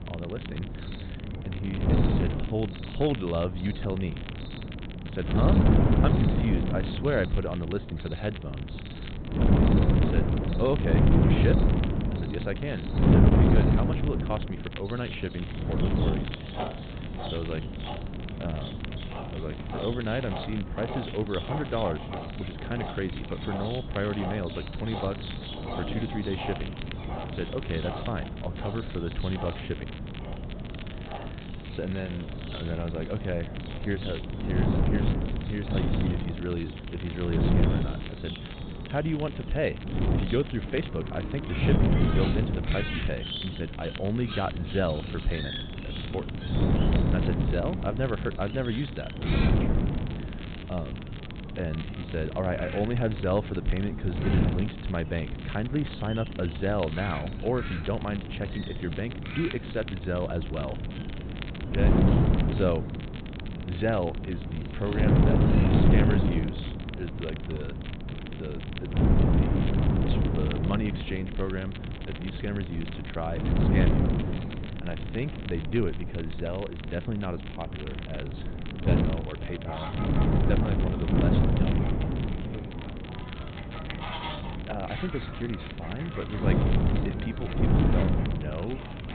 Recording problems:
high frequencies cut off; severe; nothing above 4 kHz
wind noise on the microphone; heavy; 2 dB below the speech
animal sounds; noticeable; throughout; 10 dB below the speech
crackle, like an old record; noticeable; 15 dB below the speech

